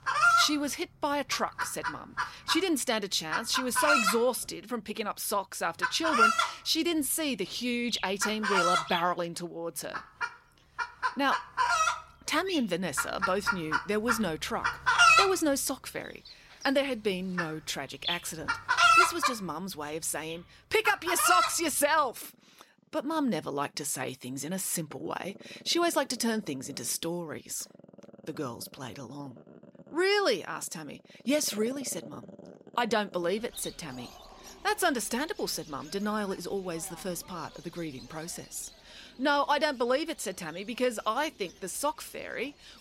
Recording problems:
animal sounds; very loud; throughout; 3 dB above the speech

